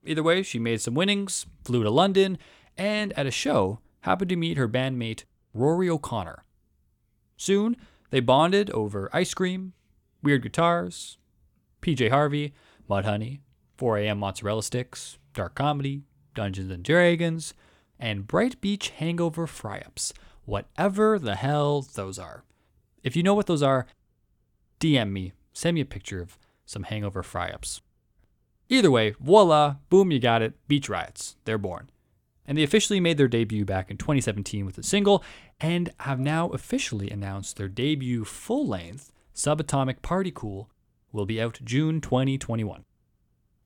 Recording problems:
none

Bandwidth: 18.5 kHz